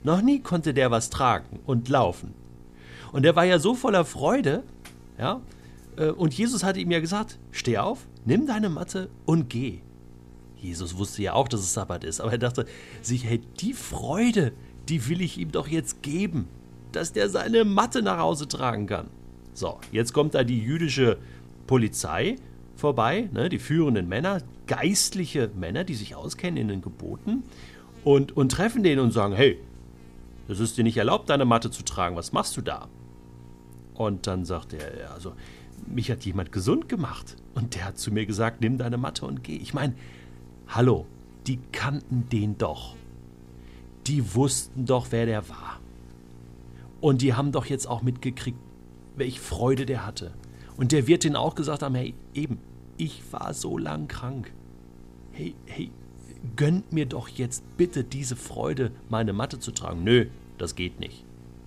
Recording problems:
electrical hum; faint; throughout; 60 Hz, 25 dB below the speech

